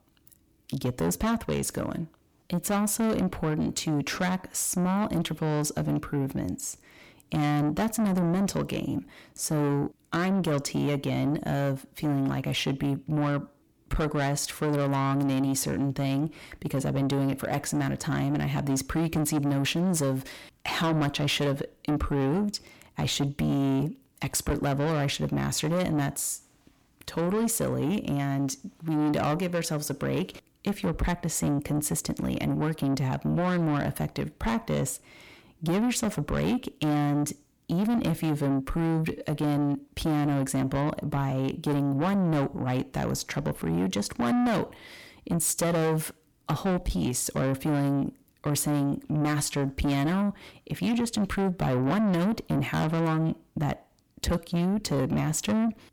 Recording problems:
distortion; heavy; 8 dB below the speech

